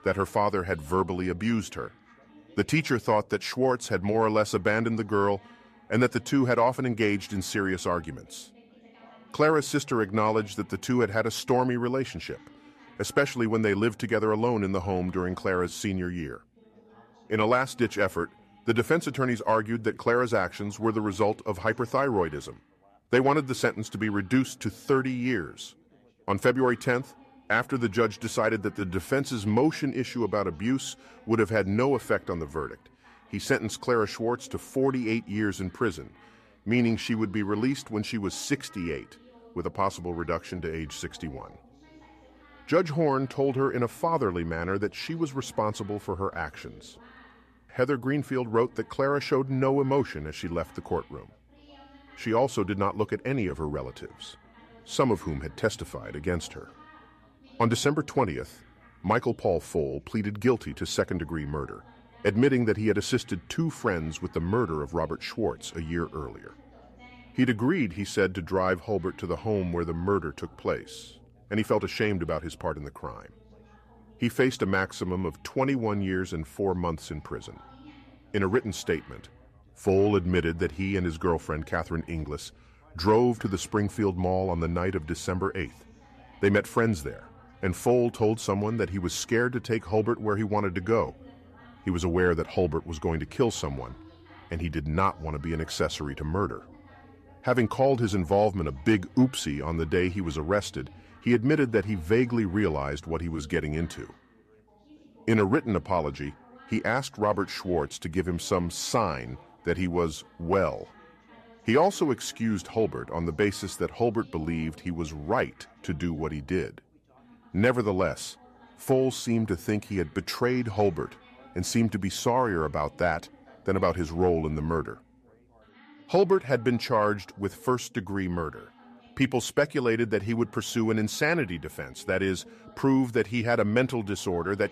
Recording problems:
background chatter; faint; throughout; 3 voices, 25 dB below the speech

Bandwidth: 14.5 kHz